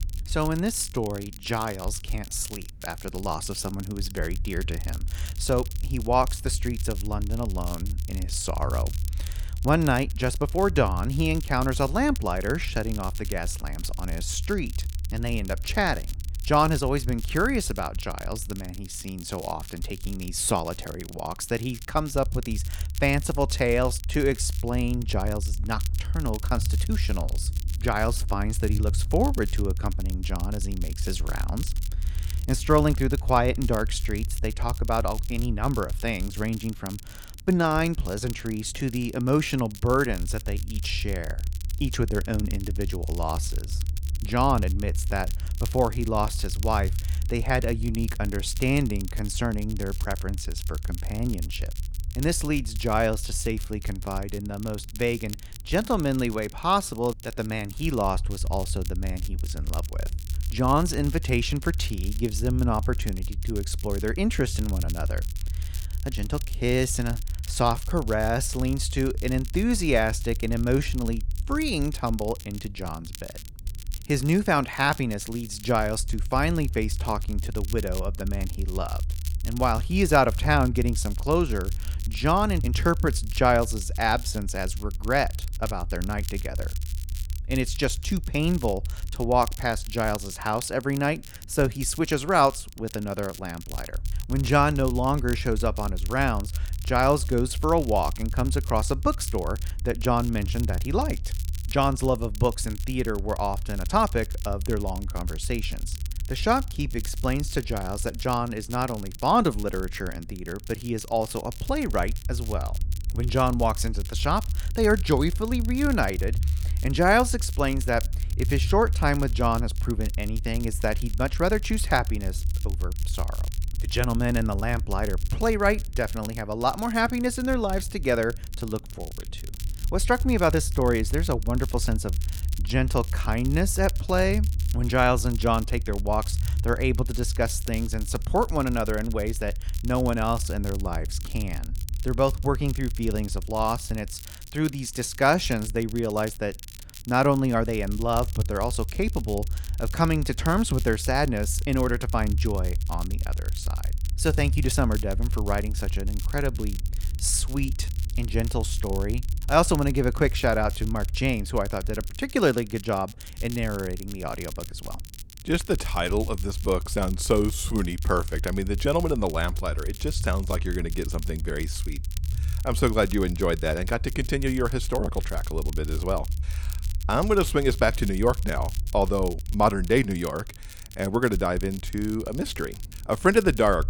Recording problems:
crackle, like an old record; noticeable; 15 dB below the speech
low rumble; faint; throughout; 25 dB below the speech

